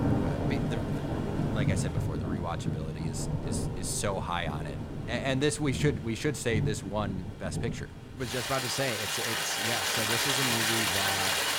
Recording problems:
rain or running water; very loud; throughout; 3 dB above the speech

